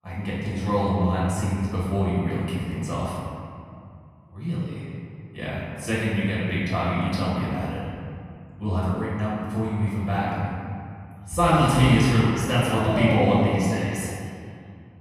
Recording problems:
room echo; strong; dies away in 2.2 s
off-mic speech; far

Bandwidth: 14.5 kHz